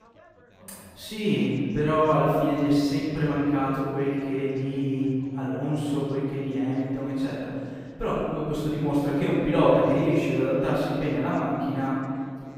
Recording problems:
room echo; strong; dies away in 2 s
off-mic speech; far
background chatter; faint; throughout; 3 voices, 30 dB below the speech

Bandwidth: 15.5 kHz